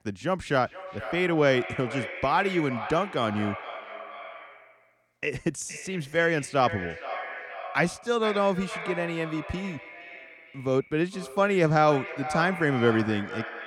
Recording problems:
echo of what is said; strong; throughout; 460 ms later, 10 dB below the speech

